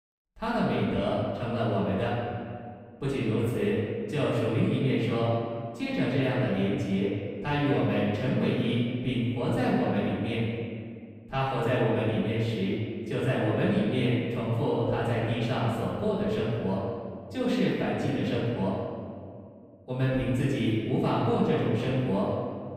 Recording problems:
room echo; strong; dies away in 1.9 s
off-mic speech; far

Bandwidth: 15.5 kHz